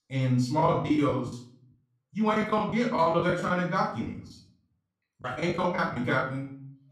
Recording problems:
off-mic speech; far
room echo; slight; dies away in 0.5 s
choppy; very; at 0.5 s, from 2.5 to 4 s and from 5 to 6 s; 17% of the speech affected

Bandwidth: 15 kHz